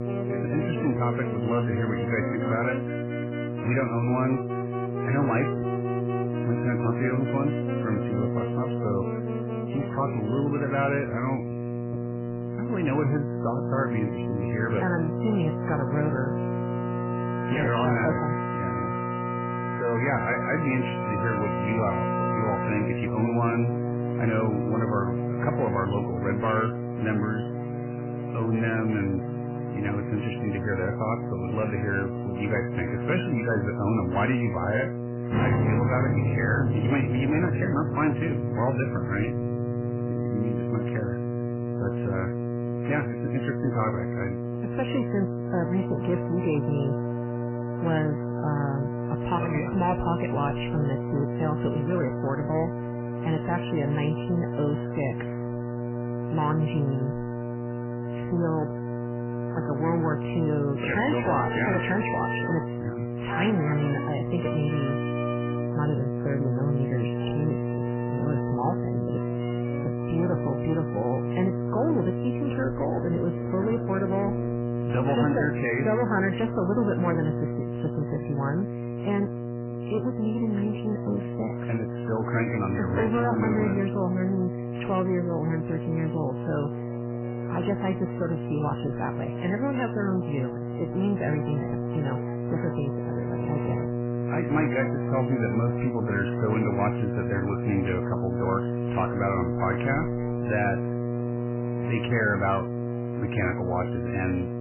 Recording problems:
garbled, watery; badly; nothing above 3 kHz
distortion; slight; 10 dB below the speech
electrical hum; loud; throughout; 60 Hz, 5 dB below the speech
background music; loud; throughout; 7 dB below the speech

